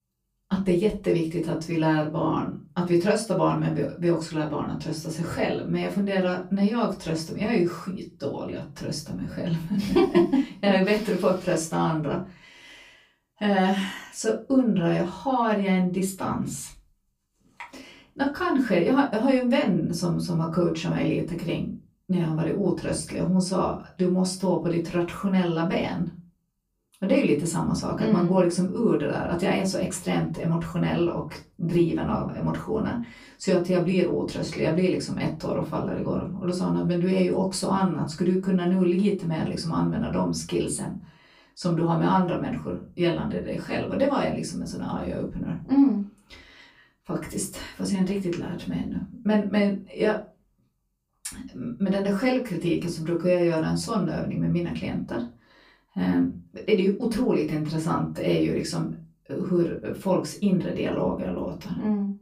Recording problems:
off-mic speech; far
room echo; very slight; dies away in 0.3 s

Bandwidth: 15 kHz